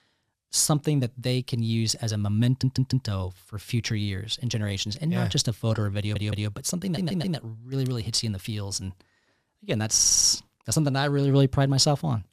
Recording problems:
audio stuttering; 4 times, first at 2.5 s

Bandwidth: 14.5 kHz